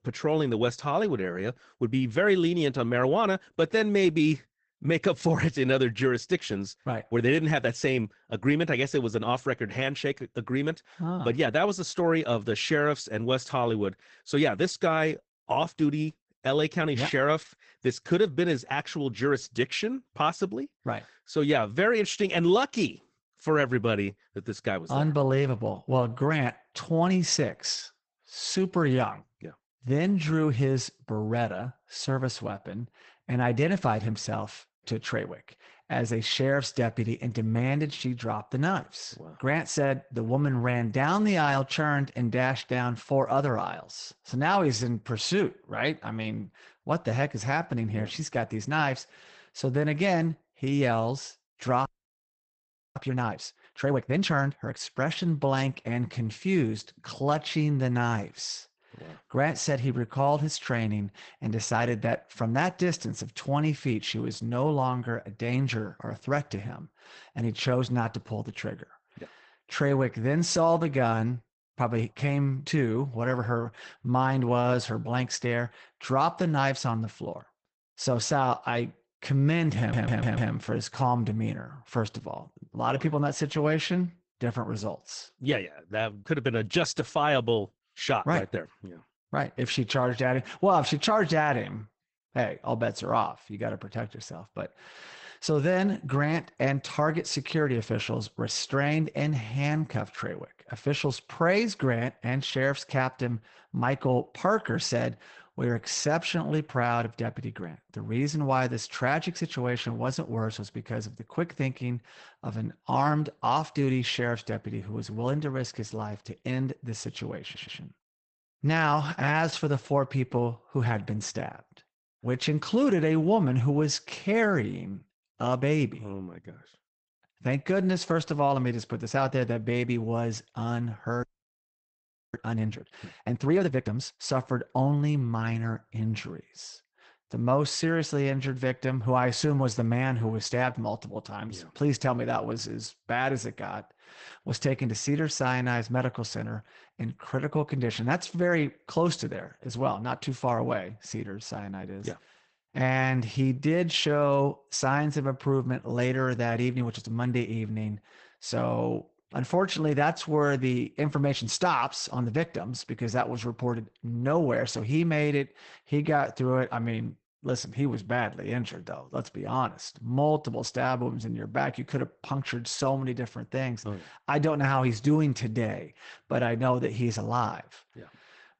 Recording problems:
garbled, watery; badly; nothing above 8 kHz
audio freezing; at 52 s for 1 s and at 2:11 for 1 s
audio stuttering; at 1:20 and at 1:57

